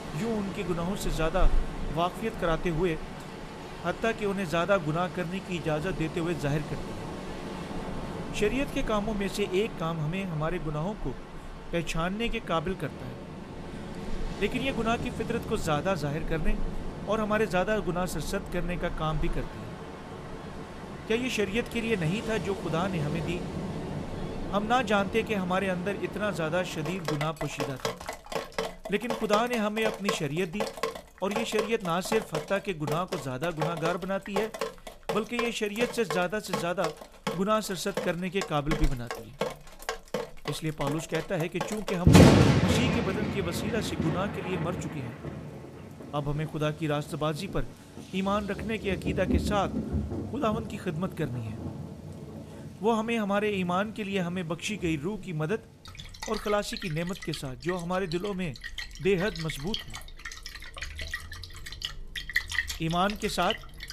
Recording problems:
rain or running water; loud; throughout; 3 dB below the speech

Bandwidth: 14.5 kHz